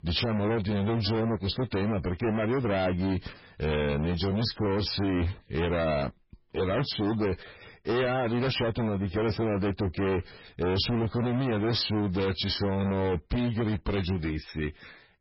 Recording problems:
distortion; heavy; 31% of the sound clipped
garbled, watery; badly; nothing above 5.5 kHz

